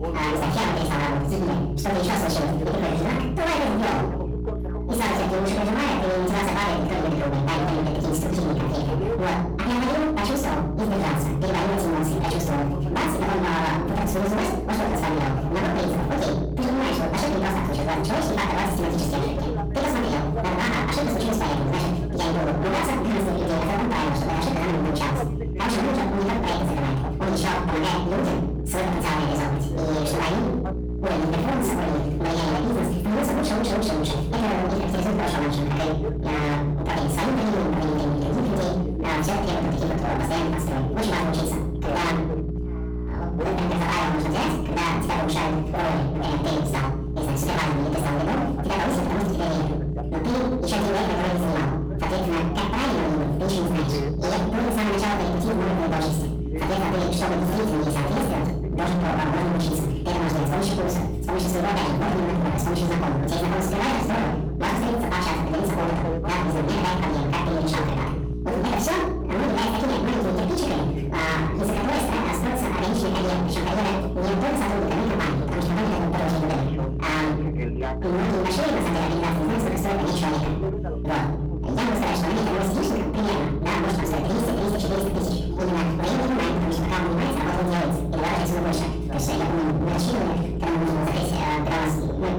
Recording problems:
distortion; heavy; 39% of the sound clipped
off-mic speech; far
wrong speed and pitch; too fast and too high; 1.7 times normal speed
room echo; noticeable; dies away in 0.8 s
electrical hum; noticeable; throughout; 60 Hz, 10 dB below the speech
voice in the background; noticeable; throughout; 10 dB below the speech

